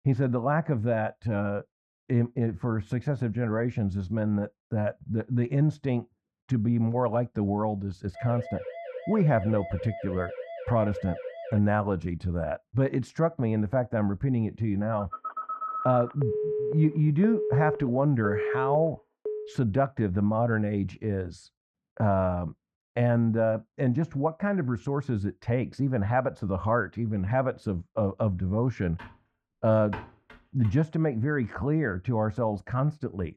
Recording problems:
muffled; very; fading above 3.5 kHz
siren; faint; from 8 to 12 s; peak 10 dB below the speech
phone ringing; noticeable; from 15 to 20 s; peak 1 dB below the speech
keyboard typing; faint; from 29 to 31 s; peak 15 dB below the speech

